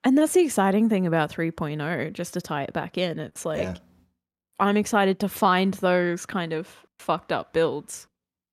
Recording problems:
none

